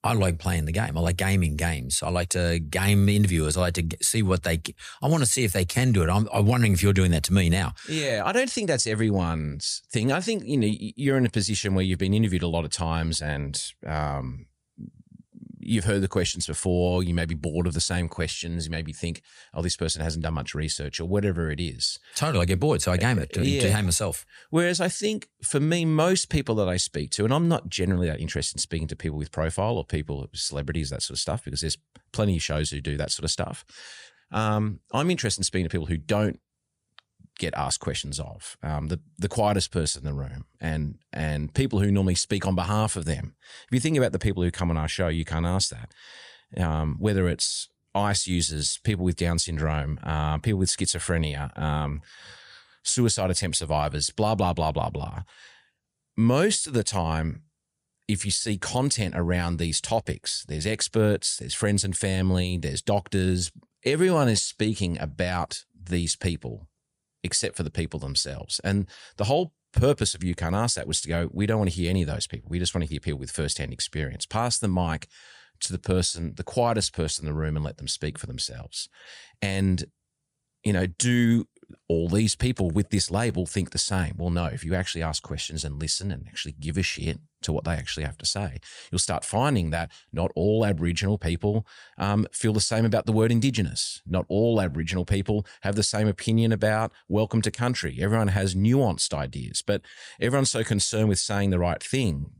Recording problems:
none

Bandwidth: 15 kHz